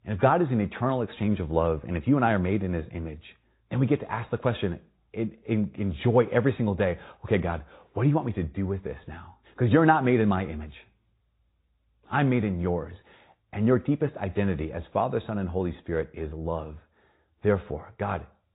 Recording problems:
high frequencies cut off; severe; nothing above 4 kHz
garbled, watery; slightly

